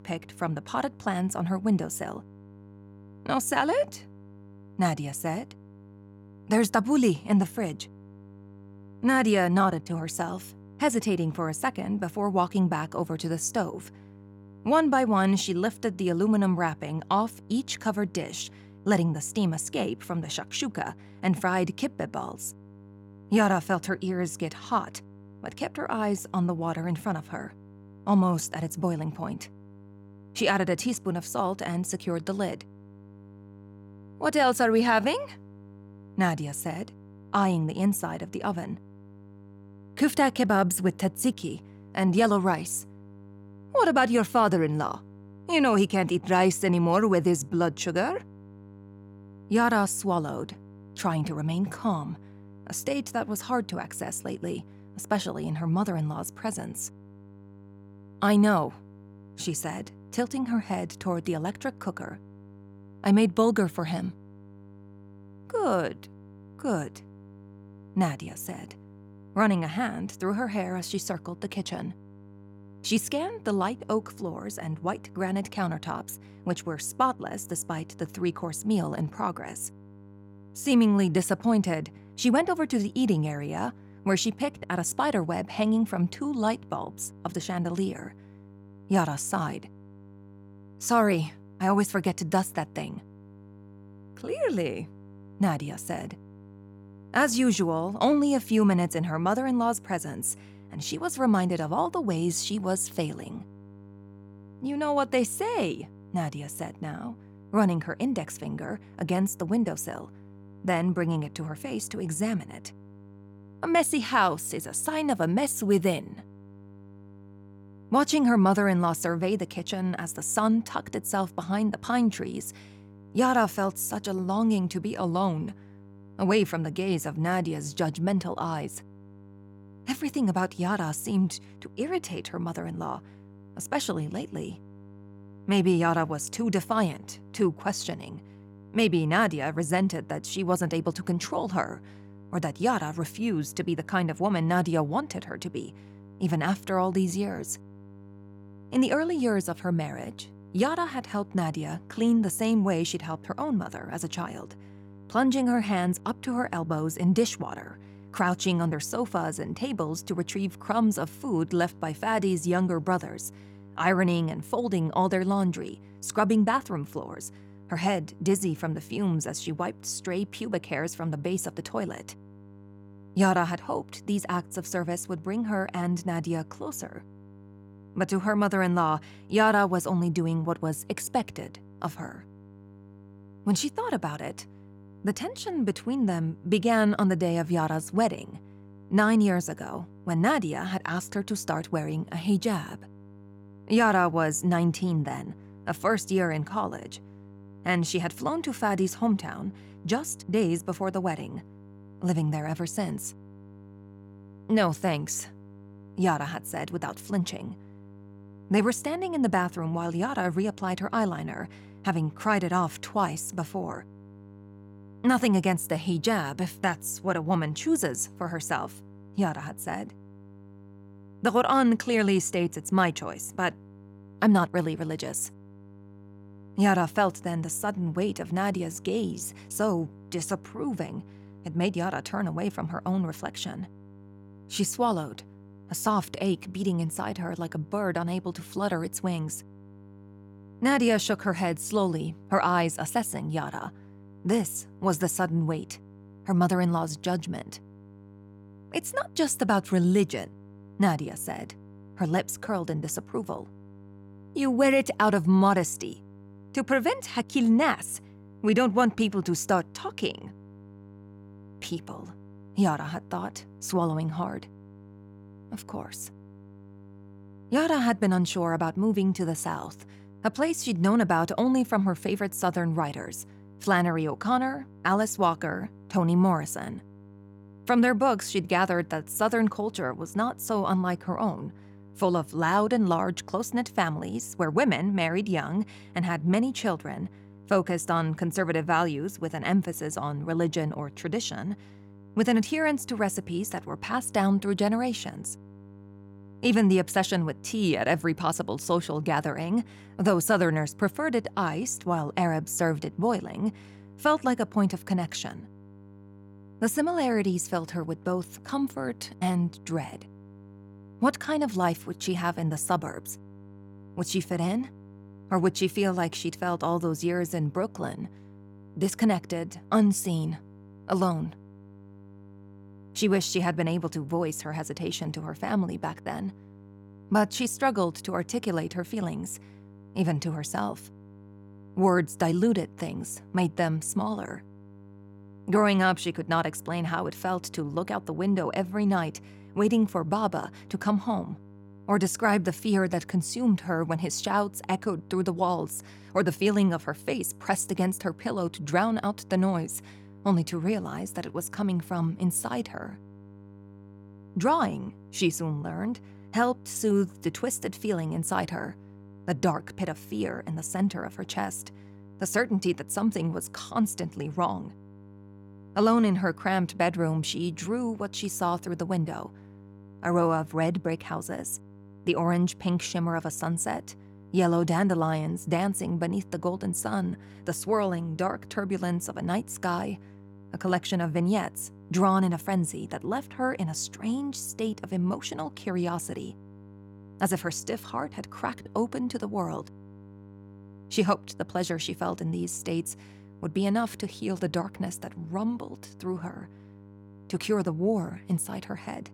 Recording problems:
electrical hum; faint; throughout; 50 Hz, 25 dB below the speech

